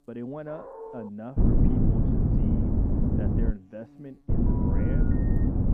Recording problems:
muffled; very; fading above 1 kHz
wind noise on the microphone; heavy; from 1.5 to 3.5 s and from 4.5 s on; 7 dB above the speech
electrical hum; faint; throughout; 60 Hz, 20 dB below the speech
dog barking; noticeable; at 0.5 s; peak 1 dB below the speech
phone ringing; noticeable; from 4.5 s on; peak 8 dB below the speech

